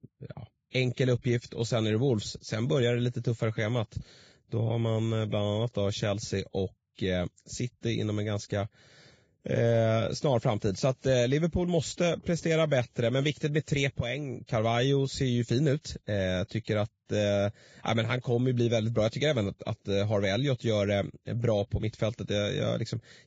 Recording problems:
garbled, watery; badly; nothing above 7.5 kHz

